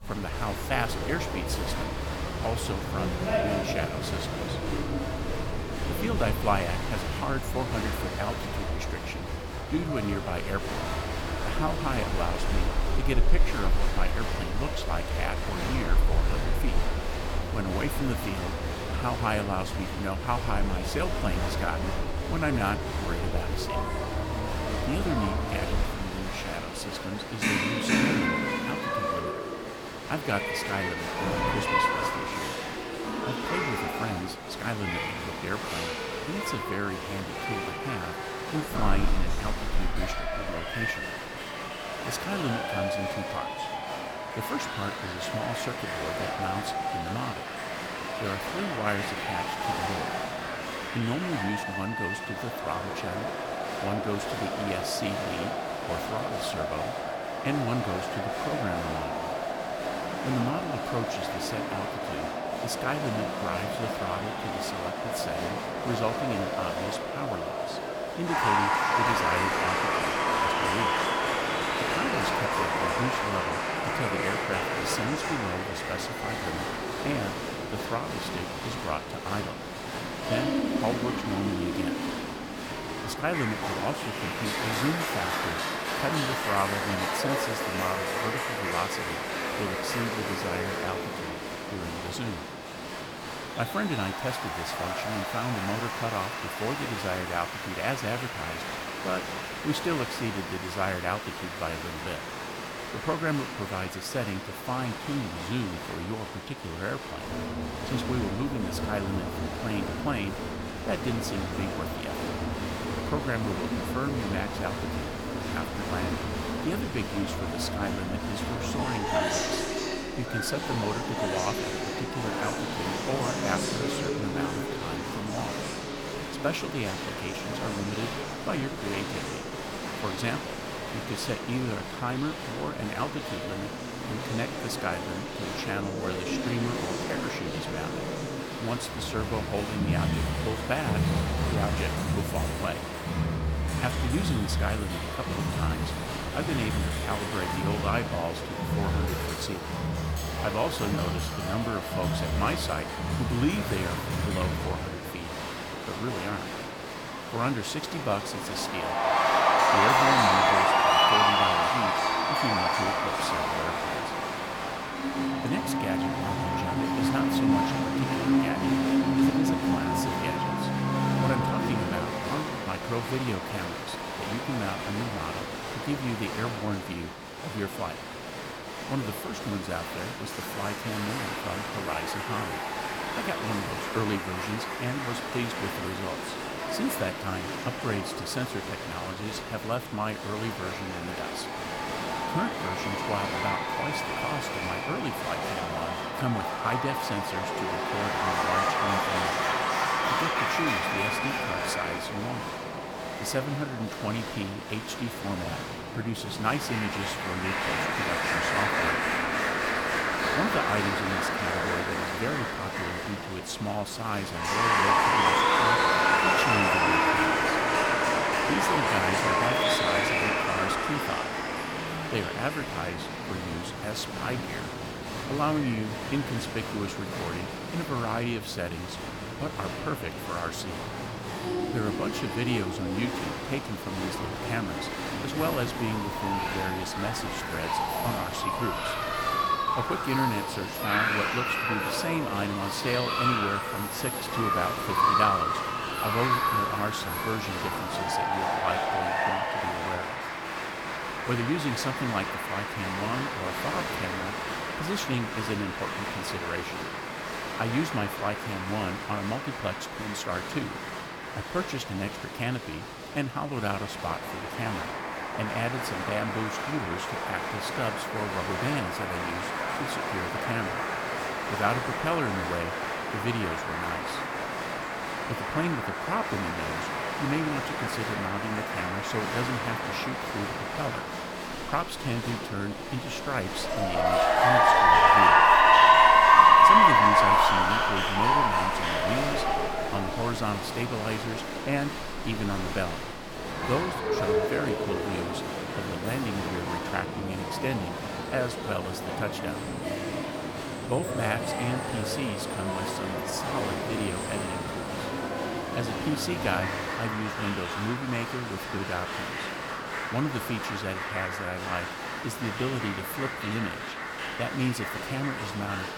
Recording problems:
crowd noise; very loud; throughout; 5 dB above the speech

